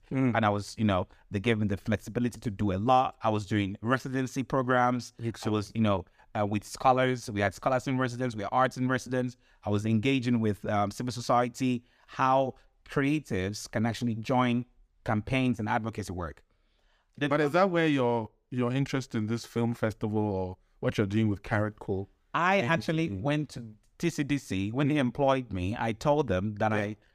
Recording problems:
none

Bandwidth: 15 kHz